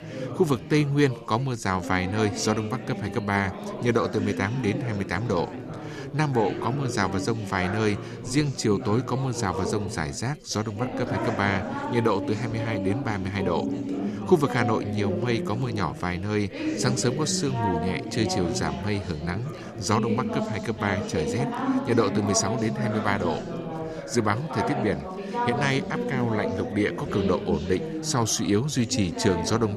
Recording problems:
chatter from many people; loud; throughout; 5 dB below the speech
abrupt cut into speech; at the end

